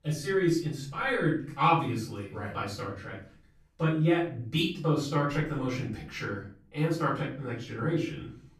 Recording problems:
off-mic speech; far
room echo; noticeable; dies away in 0.4 s

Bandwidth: 14 kHz